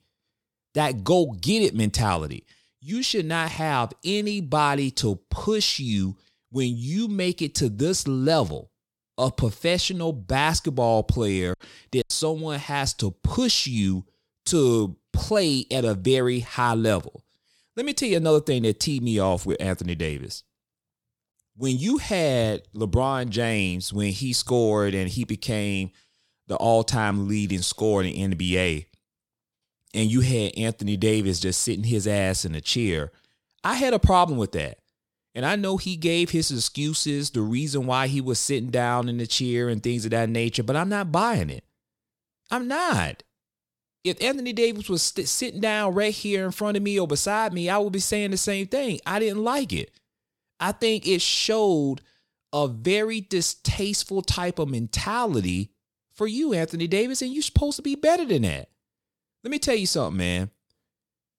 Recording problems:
choppy; occasionally; at 12 s; 3% of the speech affected

